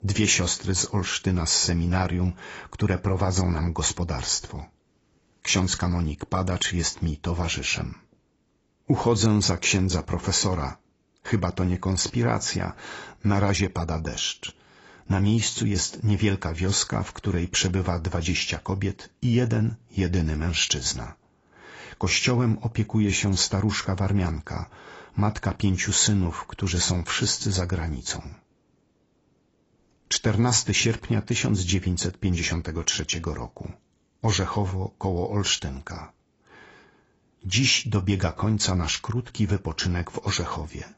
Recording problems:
garbled, watery; badly; nothing above 7.5 kHz

